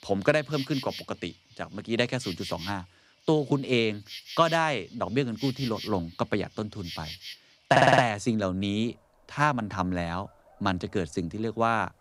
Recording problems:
animal sounds; noticeable; throughout; 15 dB below the speech
audio stuttering; at 7.5 s

